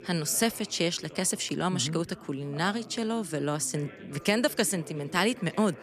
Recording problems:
background chatter; noticeable; throughout; 3 voices, 20 dB below the speech

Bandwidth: 14 kHz